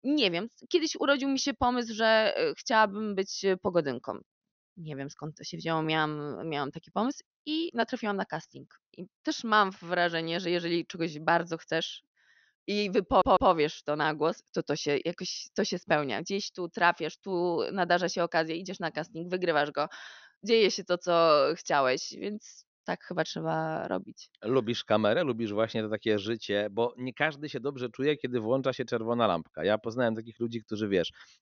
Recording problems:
high frequencies cut off; noticeable; nothing above 6.5 kHz
audio stuttering; at 13 s

